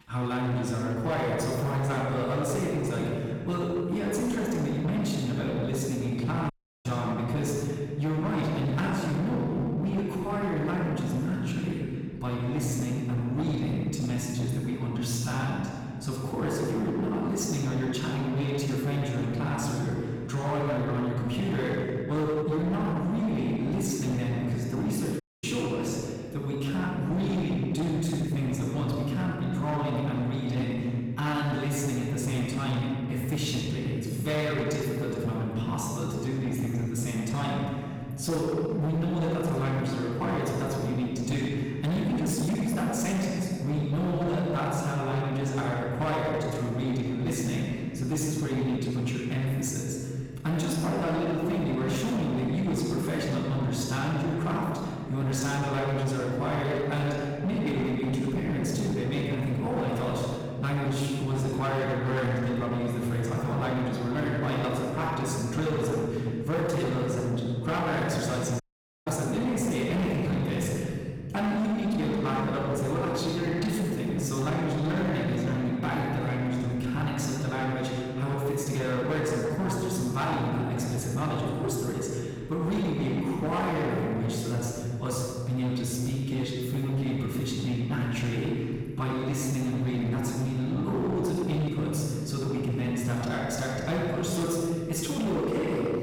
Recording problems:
room echo; strong; dies away in 2.5 s
off-mic speech; far
distortion; slight; 21% of the sound clipped
audio cutting out; at 6.5 s, at 25 s and at 1:09

